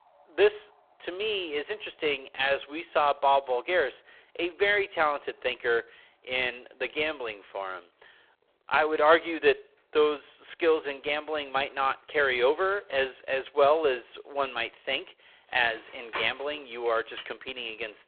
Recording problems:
phone-call audio; poor line
traffic noise; noticeable; throughout; 15 dB below the speech

